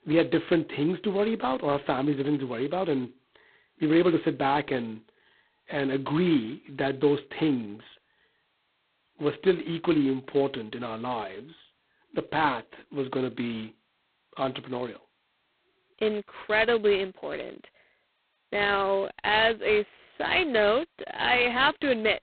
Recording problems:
phone-call audio; poor line; nothing above 4 kHz

